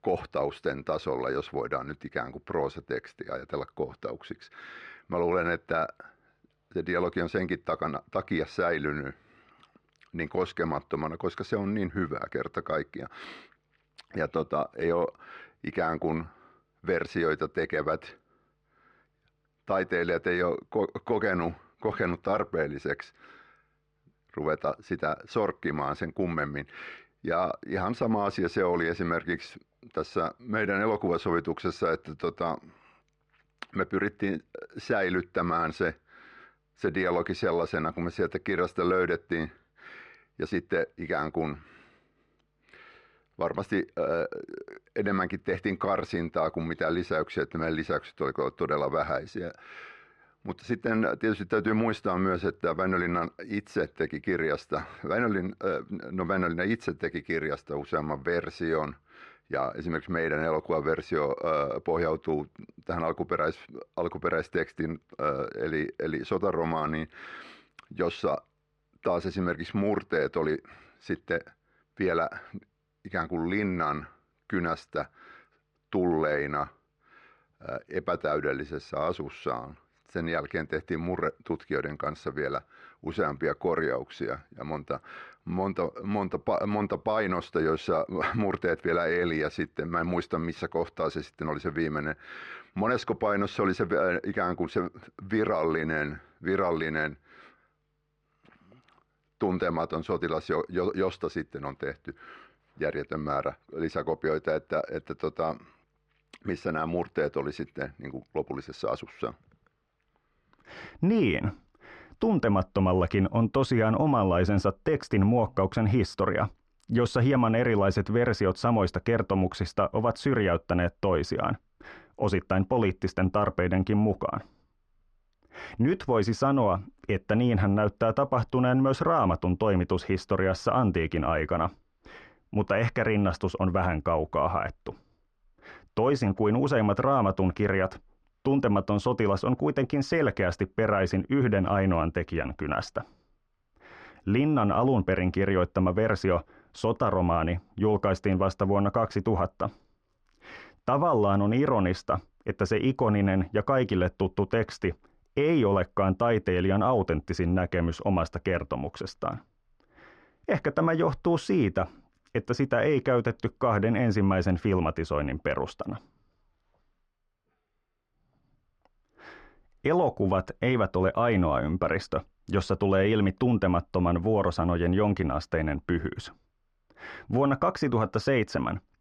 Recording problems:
muffled; very; fading above 2 kHz

